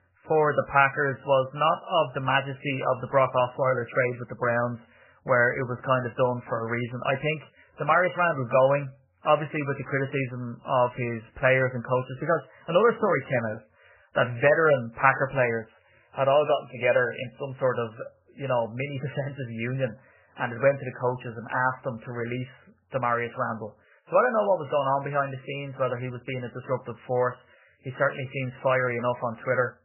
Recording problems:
garbled, watery; badly; nothing above 3 kHz

